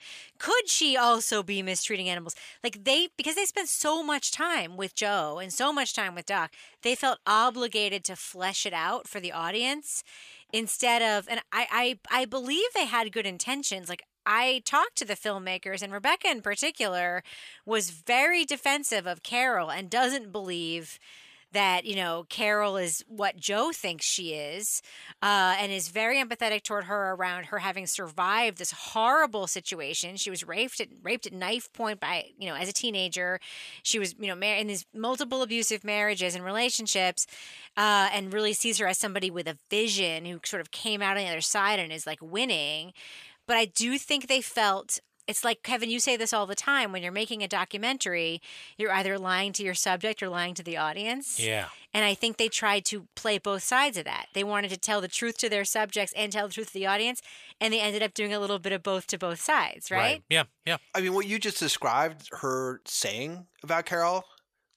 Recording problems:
thin; somewhat; fading below 750 Hz

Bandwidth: 14.5 kHz